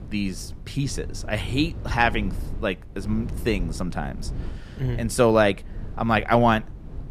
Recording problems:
wind noise on the microphone; occasional gusts; 20 dB below the speech

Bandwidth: 14.5 kHz